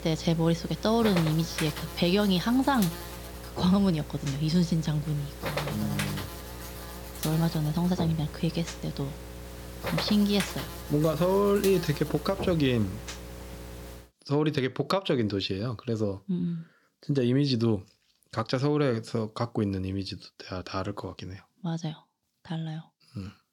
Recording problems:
electrical hum; loud; until 14 s; 60 Hz, 8 dB below the speech

